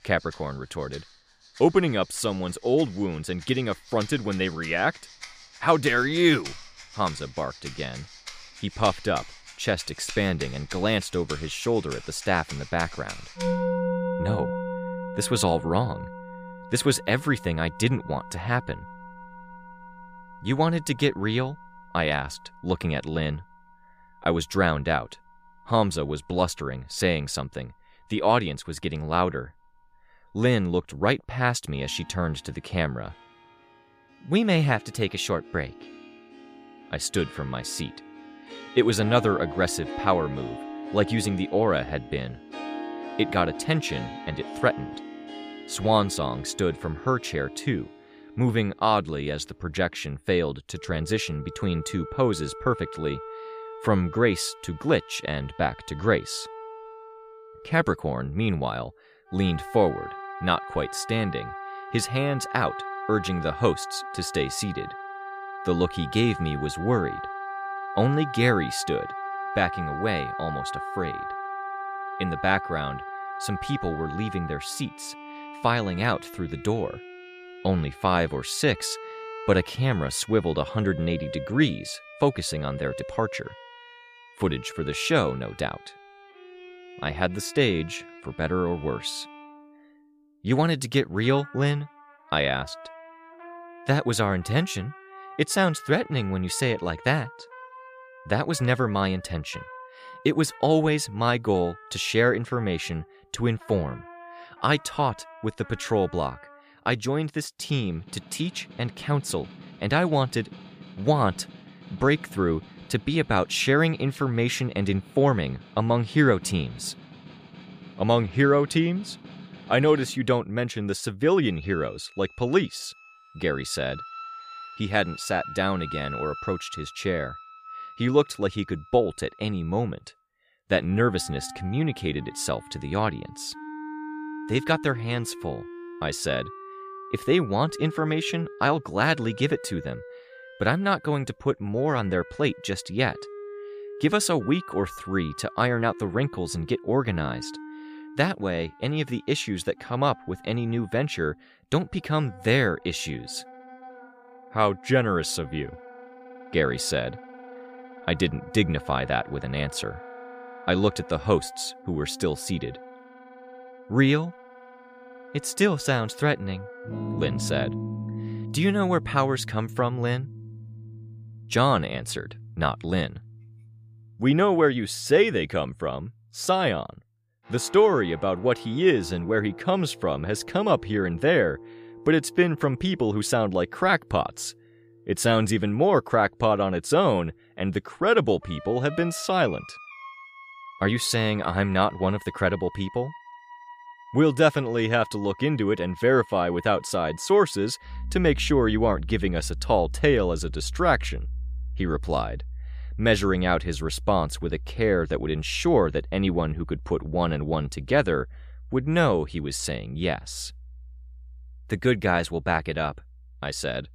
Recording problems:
background music; noticeable; throughout; 15 dB below the speech

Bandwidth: 15 kHz